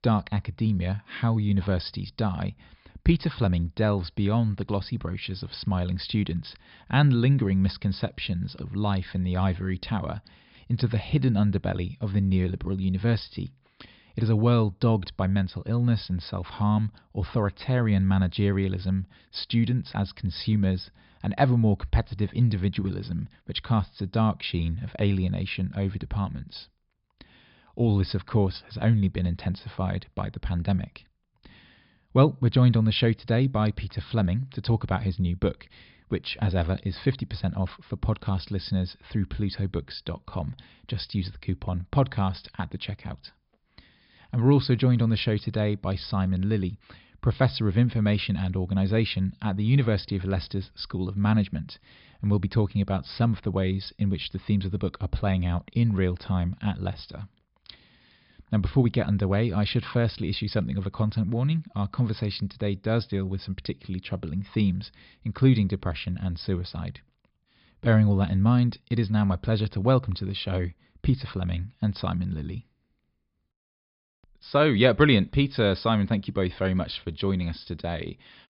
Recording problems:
high frequencies cut off; noticeable; nothing above 5.5 kHz

